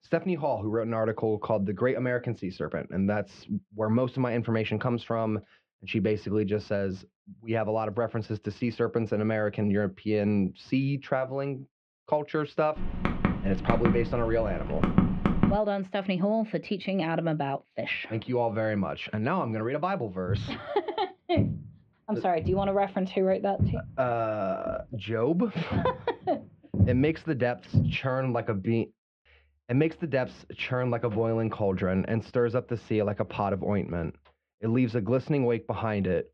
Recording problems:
muffled; very; fading above 3 kHz
keyboard typing; loud; from 13 to 16 s; peak 4 dB above the speech
footsteps; loud; from 20 to 28 s; peak 2 dB above the speech

